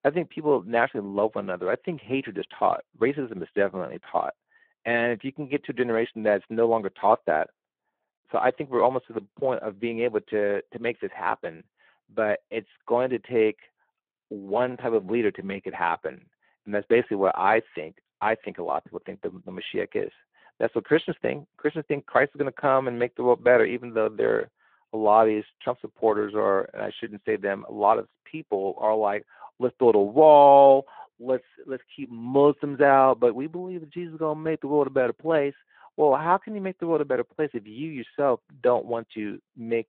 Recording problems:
phone-call audio

